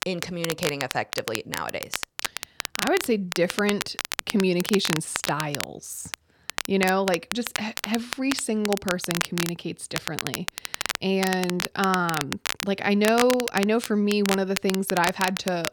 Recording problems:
crackle, like an old record; loud; 5 dB below the speech

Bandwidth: 17.5 kHz